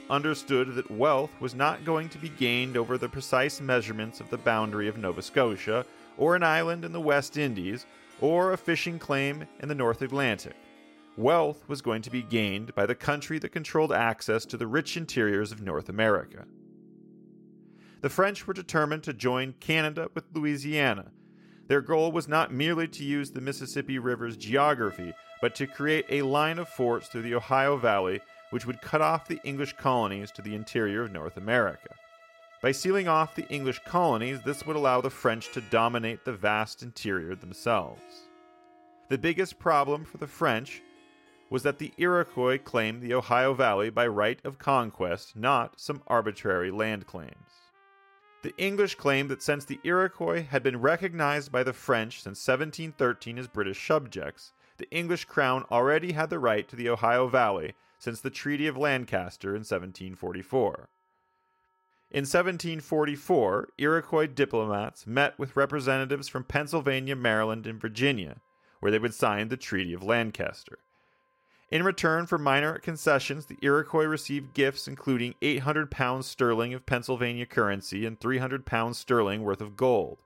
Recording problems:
background music; faint; throughout; 25 dB below the speech

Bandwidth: 16 kHz